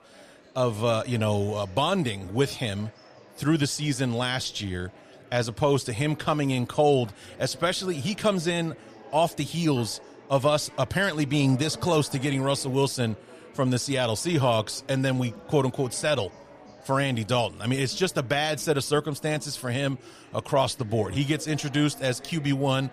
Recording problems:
murmuring crowd; faint; throughout; 20 dB below the speech

